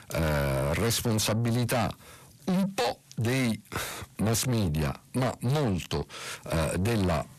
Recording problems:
distortion; heavy; 8 dB below the speech

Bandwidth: 14.5 kHz